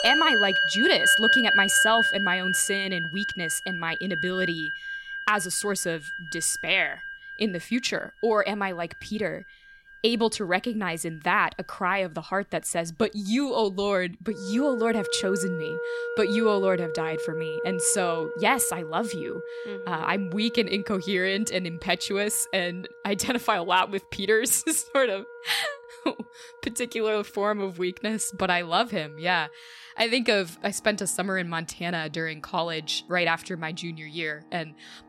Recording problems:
background music; loud; throughout; 1 dB below the speech

